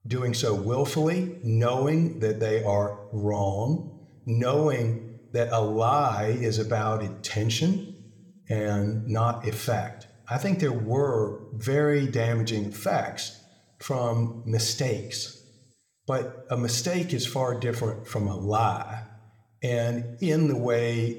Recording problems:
room echo; very slight; dies away in 0.7 s

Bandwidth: 18.5 kHz